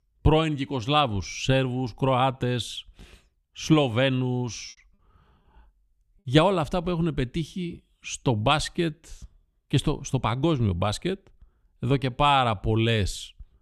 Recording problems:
choppy; occasionally; at 4.5 s; 4% of the speech affected

